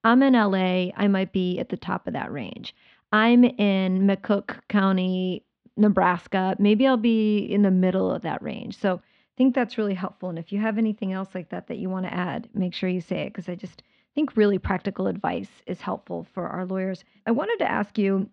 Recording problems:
muffled; slightly; fading above 3.5 kHz

